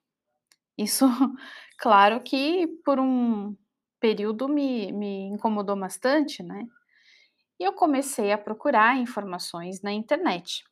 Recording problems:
none

